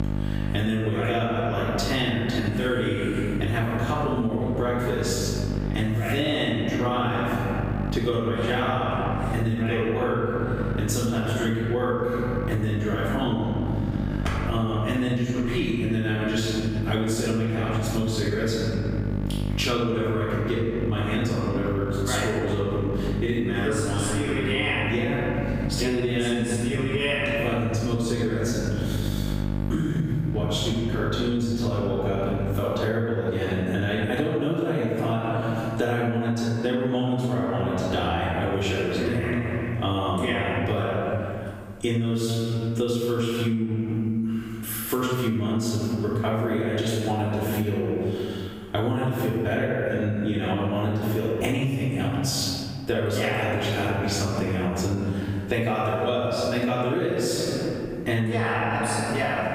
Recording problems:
room echo; strong; dies away in 1.6 s
off-mic speech; far
squashed, flat; somewhat
electrical hum; noticeable; until 33 s; 50 Hz, 15 dB below the speech

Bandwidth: 15.5 kHz